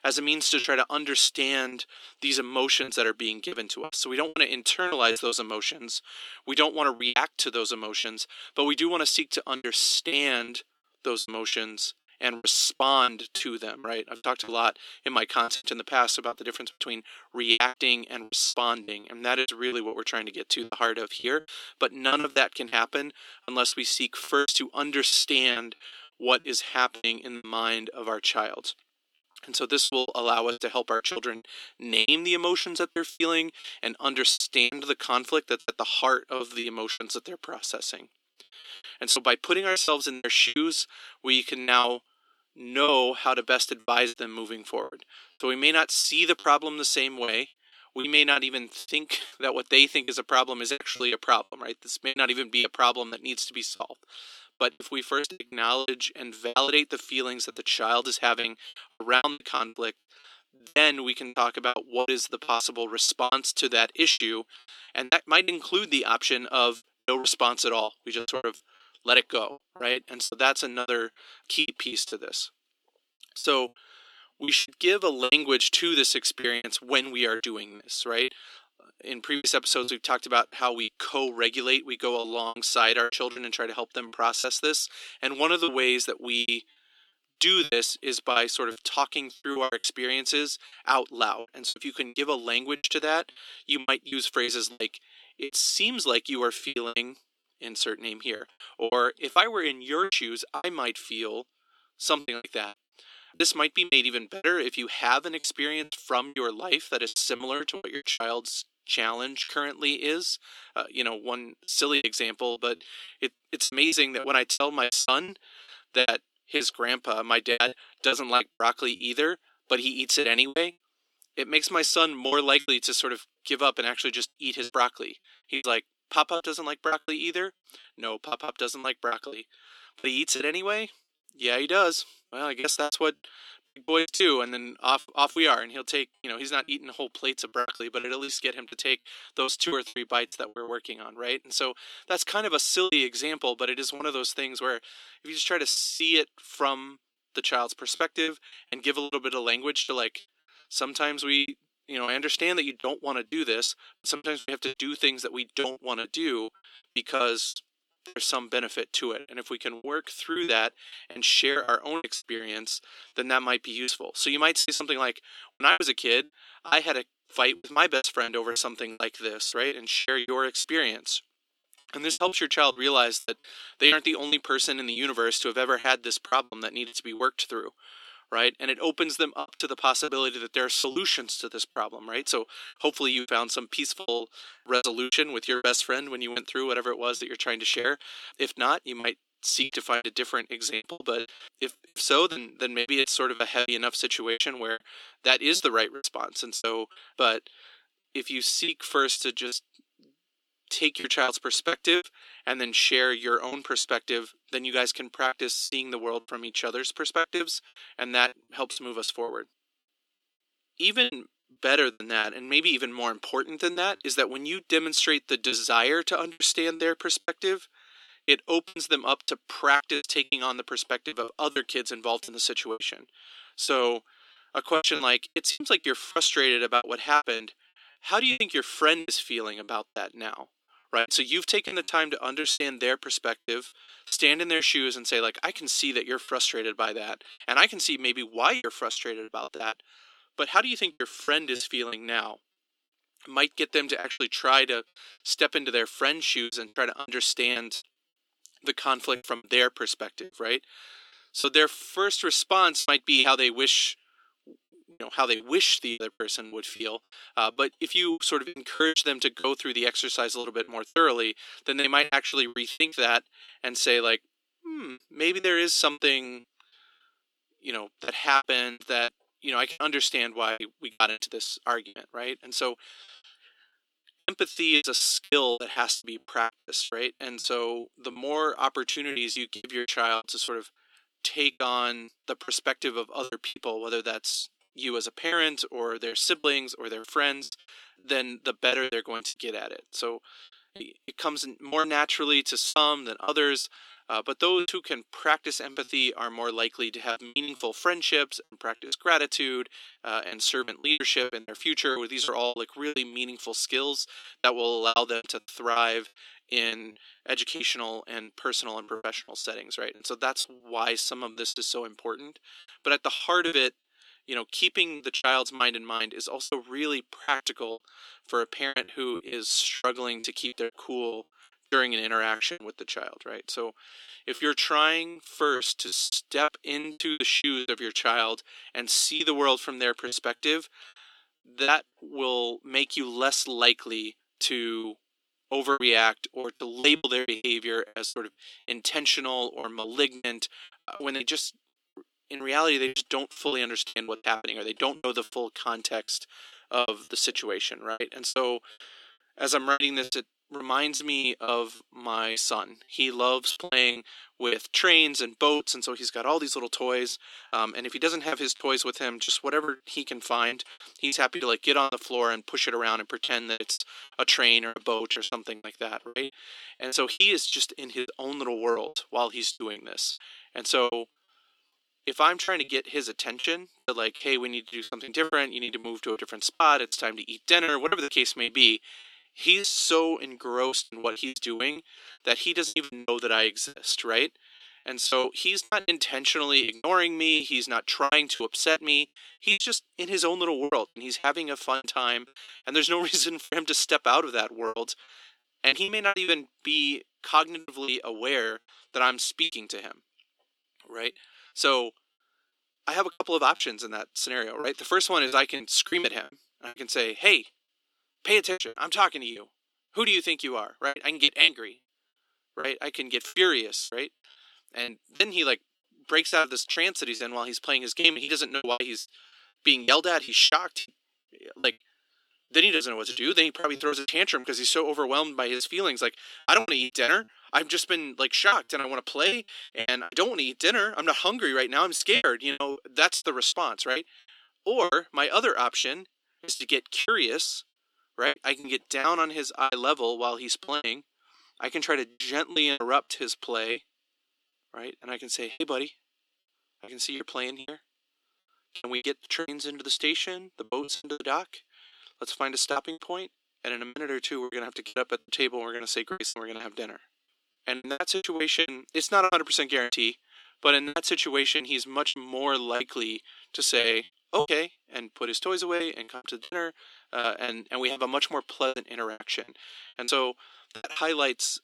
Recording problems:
thin; somewhat; fading below 300 Hz
choppy; very; 13% of the speech affected

